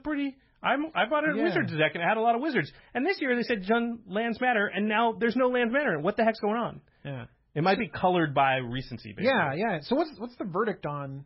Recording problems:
garbled, watery; badly; nothing above 5.5 kHz

